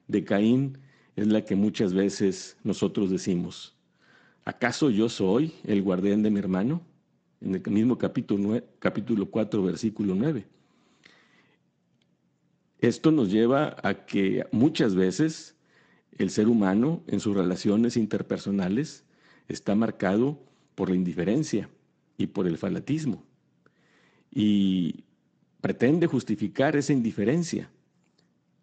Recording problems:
garbled, watery; slightly; nothing above 8 kHz

